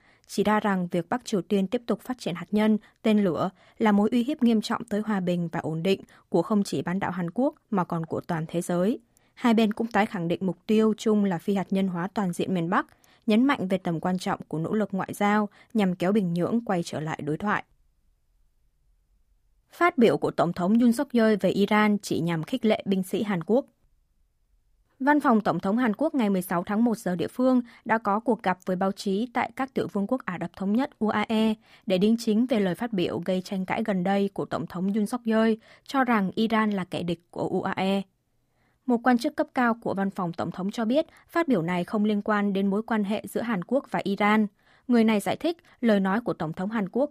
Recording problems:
none

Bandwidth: 15 kHz